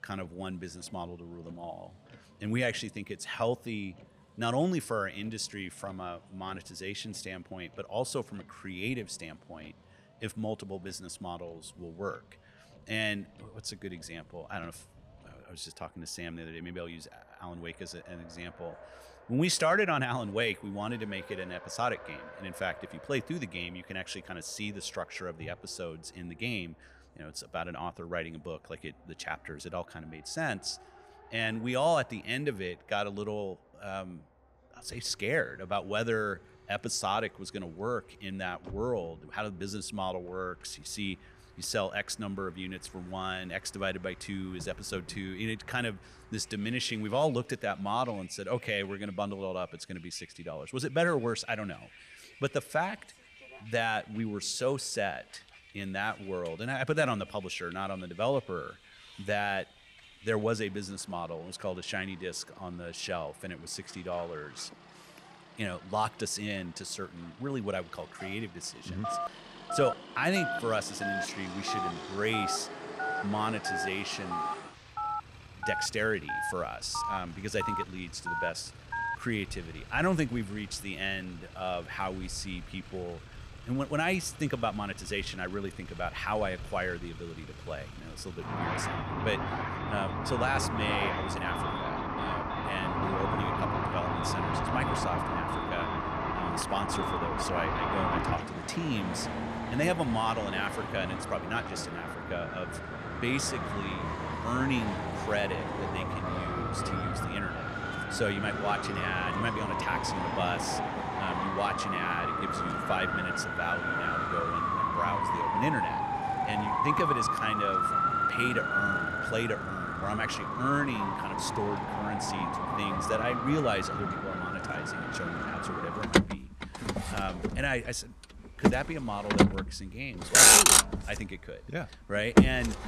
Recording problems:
traffic noise; very loud; throughout; 5 dB above the speech
phone ringing; loud; from 1:09 to 1:19; peak level with the speech

